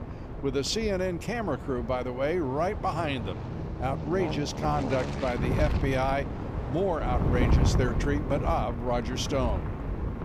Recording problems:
train or aircraft noise; loud; throughout; 8 dB below the speech
wind noise on the microphone; occasional gusts; 10 dB below the speech

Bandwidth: 15 kHz